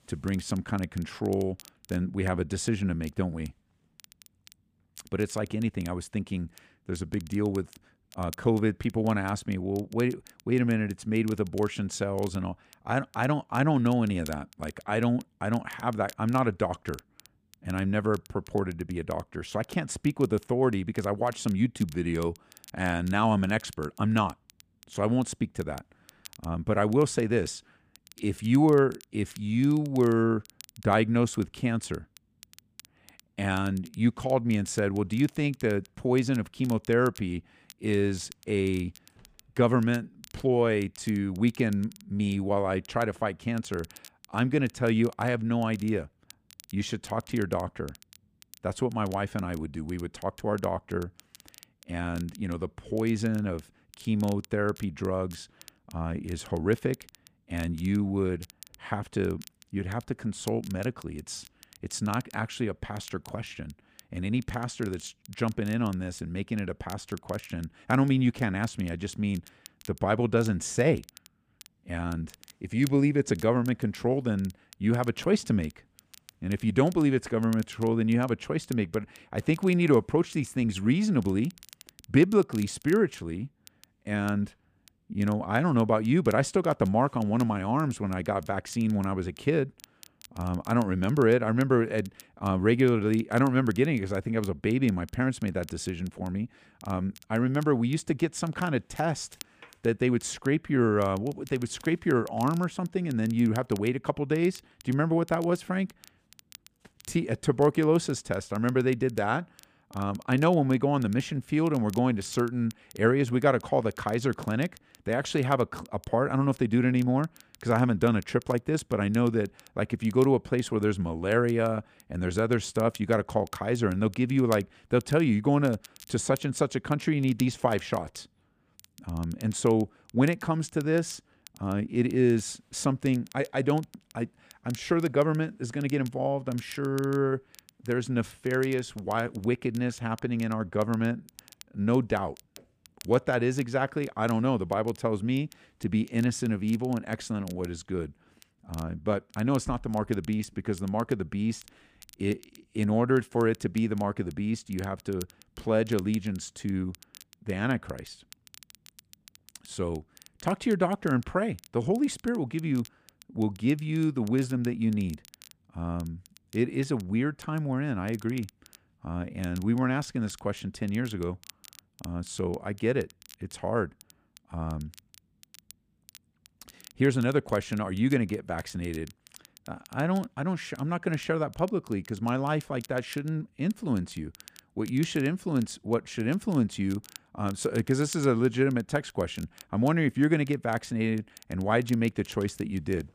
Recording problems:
crackle, like an old record; faint; 25 dB below the speech

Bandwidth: 15 kHz